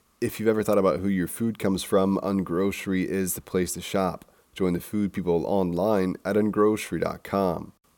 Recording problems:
none

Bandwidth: 17 kHz